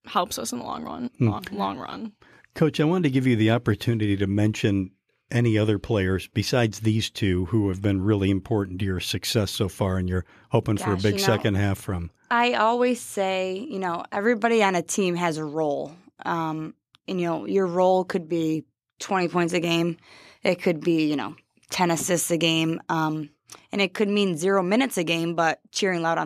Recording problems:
abrupt cut into speech; at the end

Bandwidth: 14.5 kHz